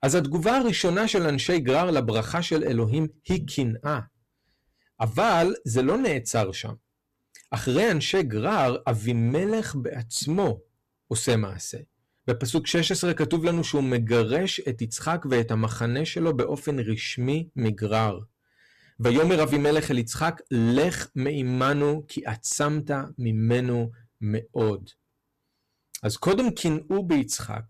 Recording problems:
distortion; slight; 8% of the sound clipped

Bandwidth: 14 kHz